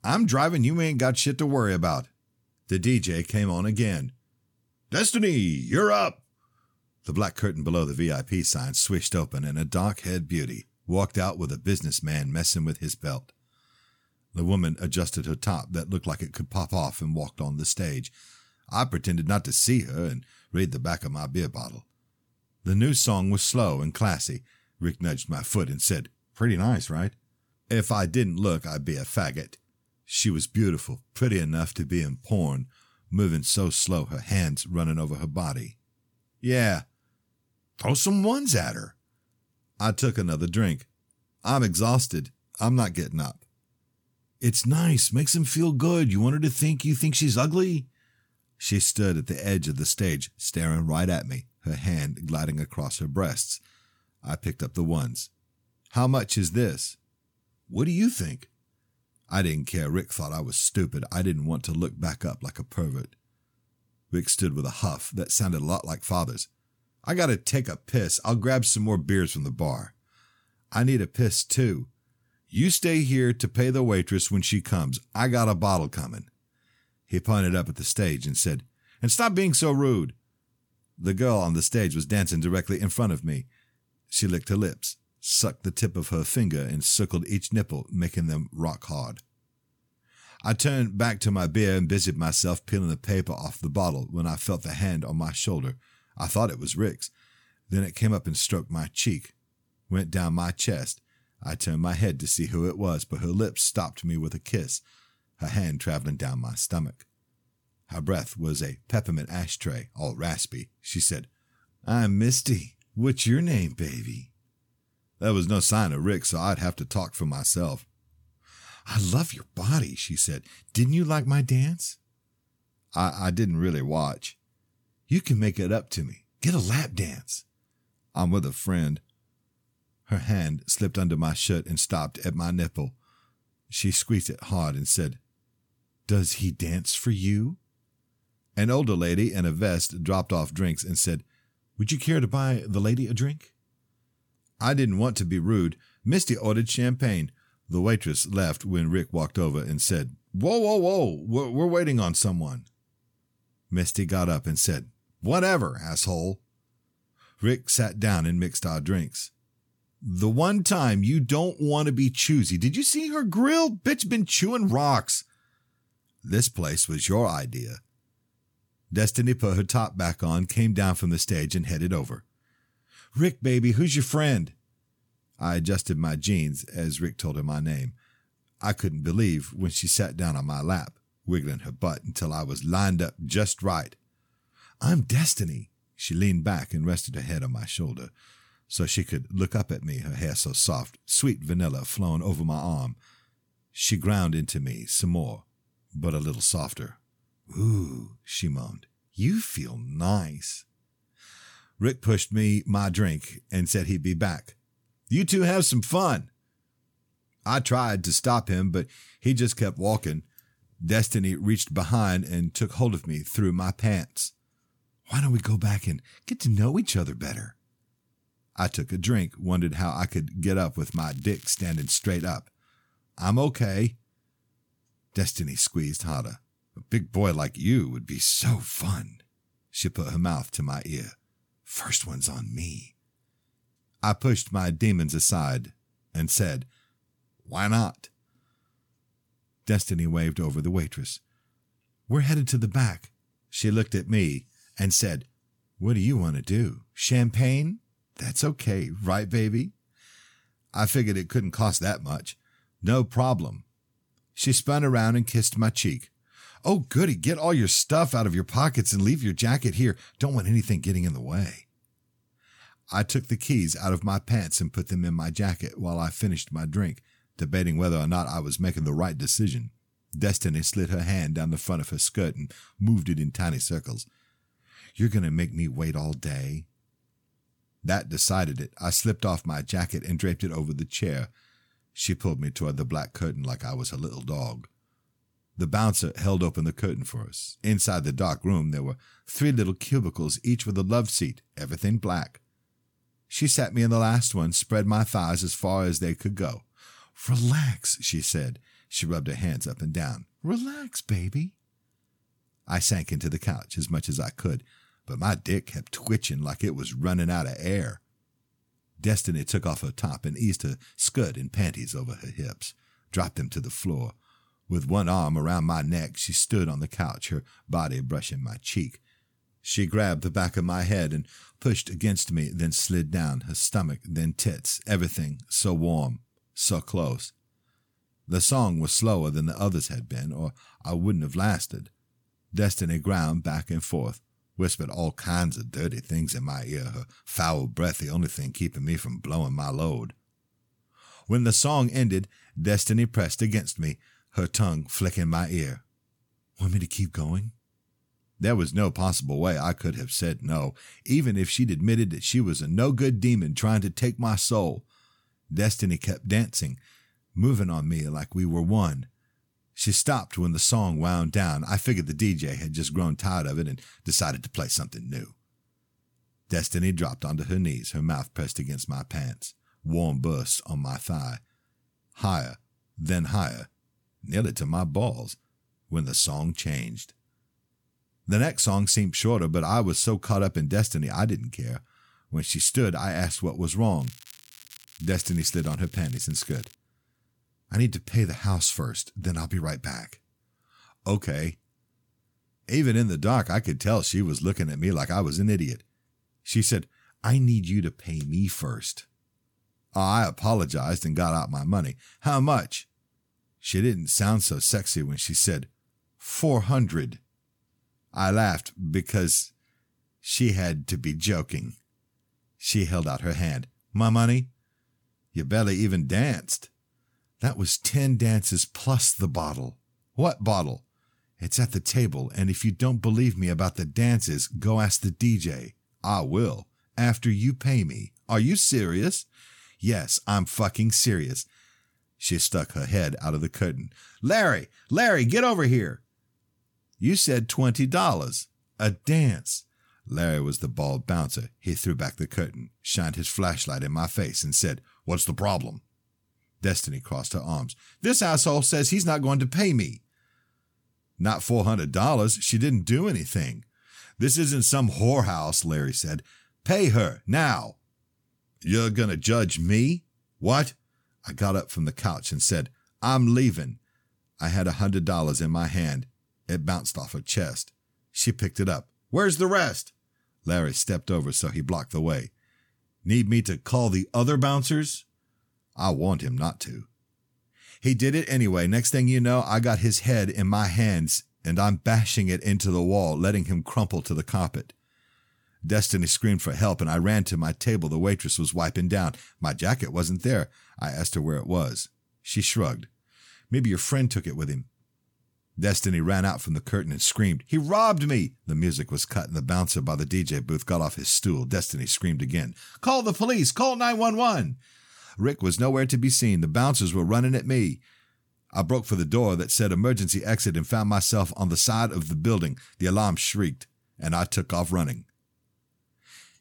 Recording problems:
crackling; faint; from 3:41 to 3:42 and from 6:24 to 6:27; 20 dB below the speech

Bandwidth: 18.5 kHz